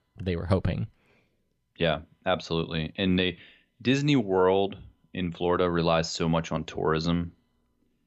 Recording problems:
none

